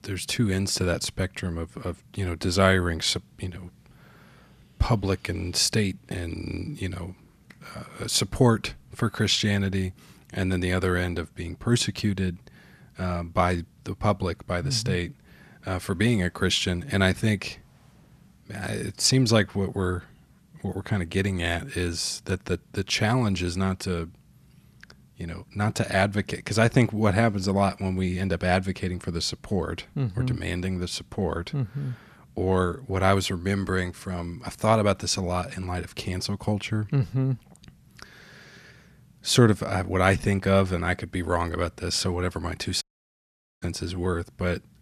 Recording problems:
audio cutting out; at 43 s for 1 s

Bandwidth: 14 kHz